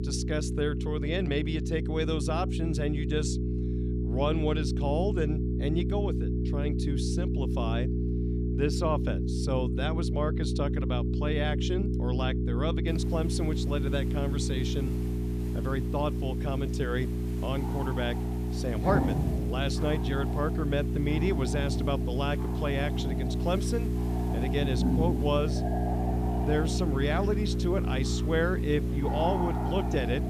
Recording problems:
electrical hum; loud; throughout; 60 Hz, 6 dB below the speech
animal sounds; loud; from 15 s on; 5 dB below the speech
background music; noticeable; from 19 s on; 10 dB below the speech
hiss; noticeable; from 13 s on; 20 dB below the speech

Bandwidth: 14.5 kHz